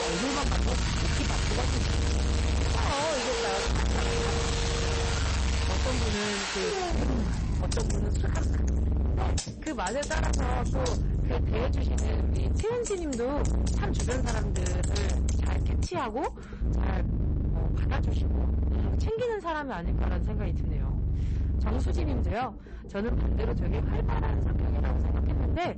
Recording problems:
distortion; heavy; 47% of the sound clipped
garbled, watery; slightly; nothing above 8 kHz
household noises; very loud; until 16 s; 1 dB above the speech
low rumble; loud; throughout; 4 dB below the speech
abrupt cut into speech; at the start

